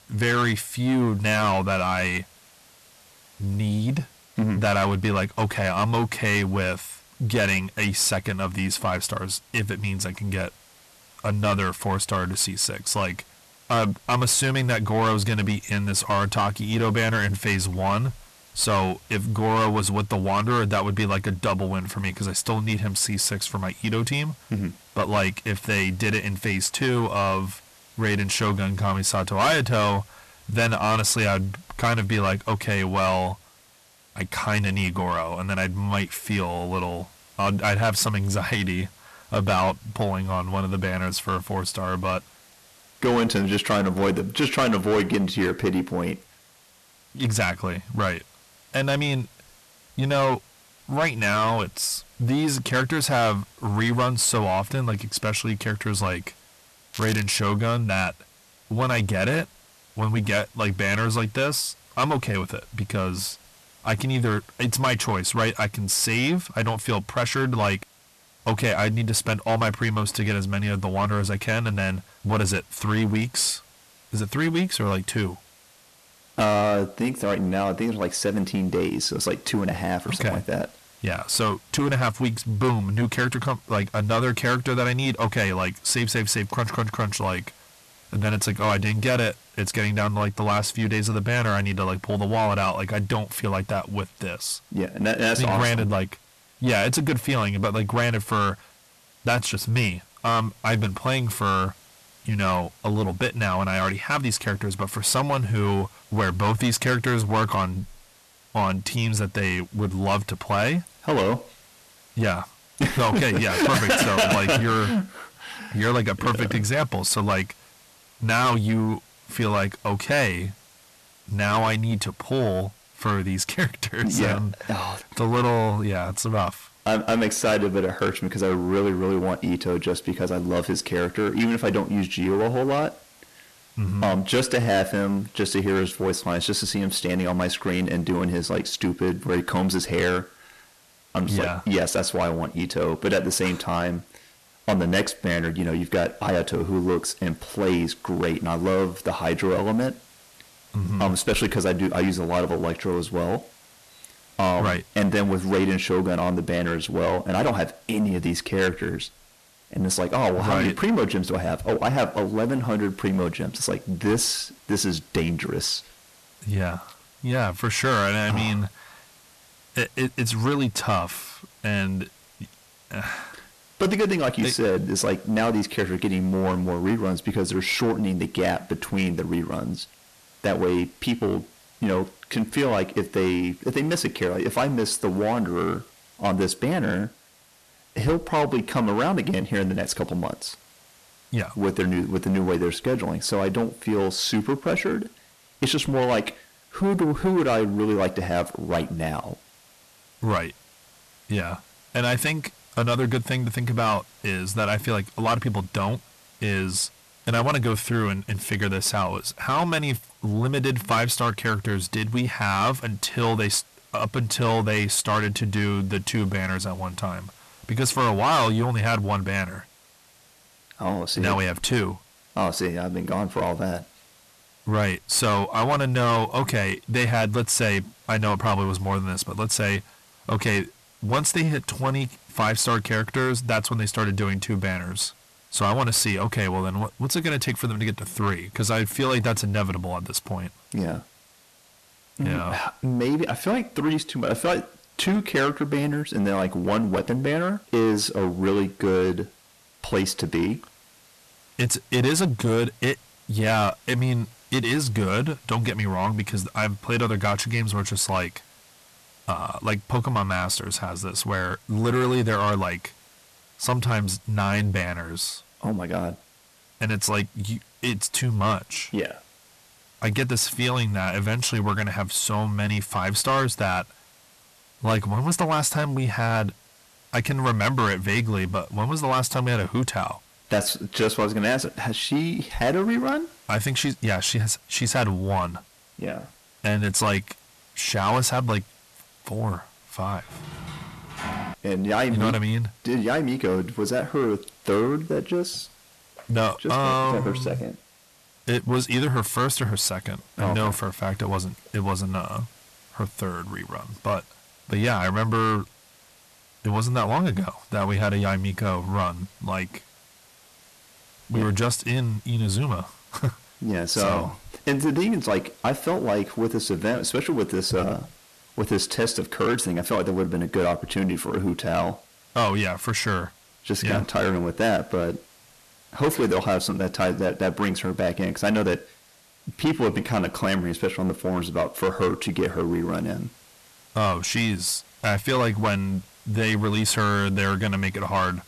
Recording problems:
distortion; heavy; 7 dB below the speech
crackling; noticeable; at 57 s; 10 dB below the speech
hiss; faint; throughout; 25 dB below the speech
door banging; noticeable; from 4:50 to 4:52; peak 7 dB below the speech

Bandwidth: 13.5 kHz